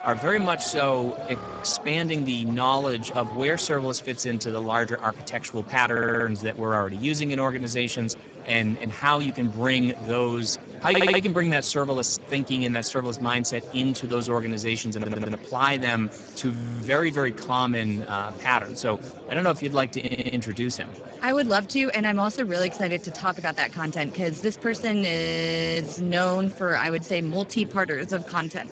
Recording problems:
garbled, watery; badly; nothing above 7.5 kHz
murmuring crowd; noticeable; throughout; 15 dB below the speech
audio freezing; at 1.5 s, at 17 s and at 25 s for 0.5 s
audio stuttering; 4 times, first at 6 s

